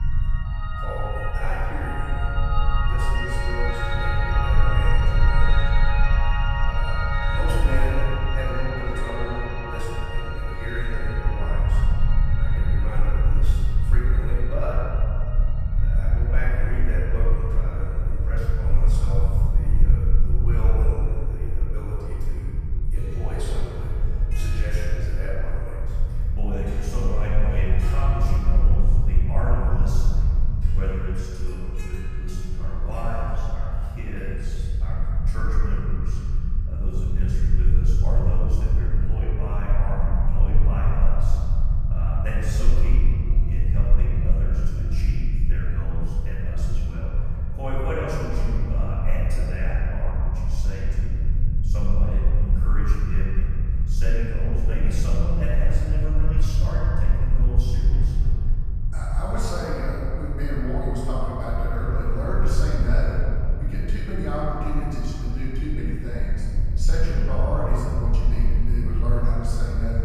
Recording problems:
room echo; strong; dies away in 2.4 s
off-mic speech; far
background music; very loud; throughout; as loud as the speech
low rumble; loud; throughout; 8 dB below the speech

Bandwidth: 15 kHz